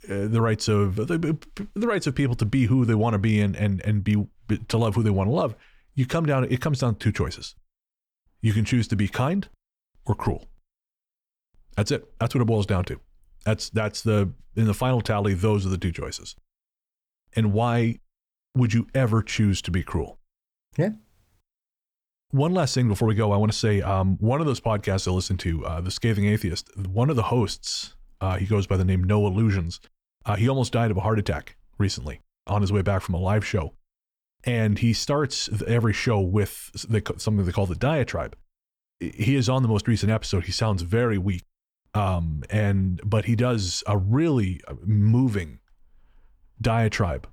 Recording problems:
none

